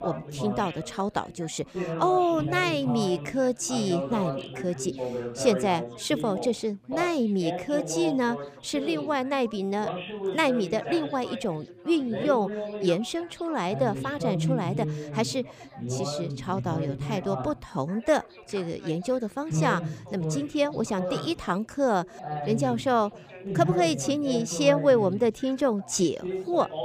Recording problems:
background chatter; loud; throughout; 4 voices, 6 dB below the speech

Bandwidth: 15 kHz